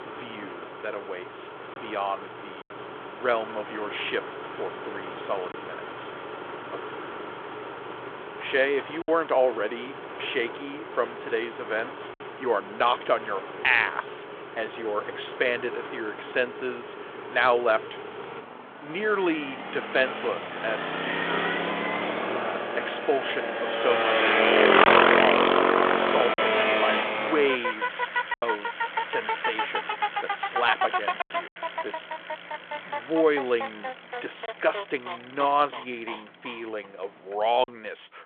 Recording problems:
phone-call audio
traffic noise; very loud; throughout; 1 dB above the speech
choppy; occasionally; 1% of the speech affected

